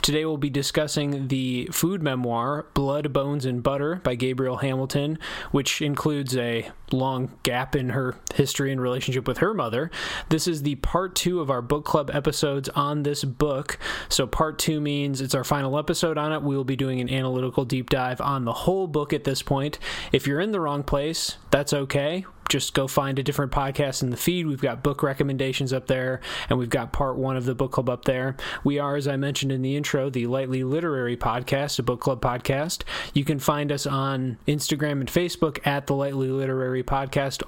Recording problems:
squashed, flat; somewhat

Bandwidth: 16.5 kHz